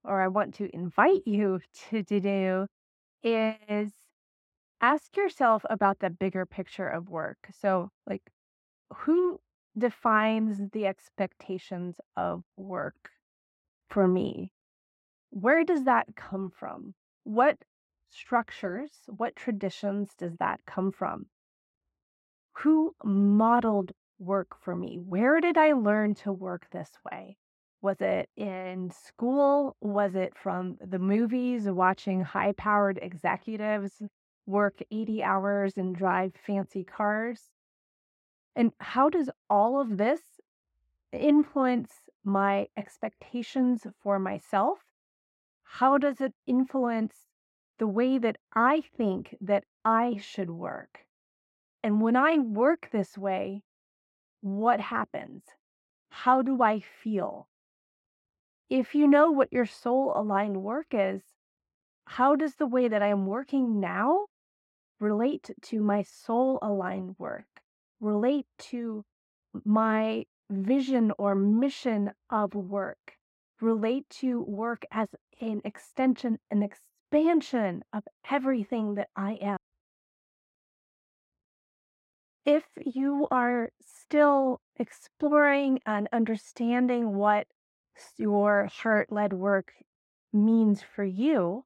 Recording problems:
muffled; very; fading above 3 kHz

